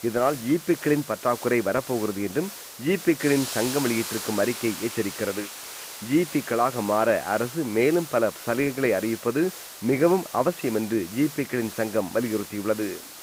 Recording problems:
high frequencies cut off; severe; nothing above 4 kHz
hiss; noticeable; throughout; 10 dB below the speech

